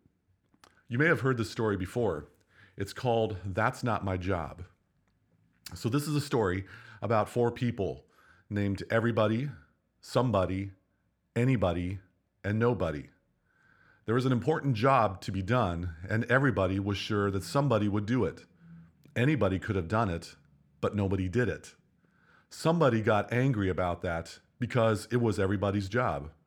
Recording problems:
none

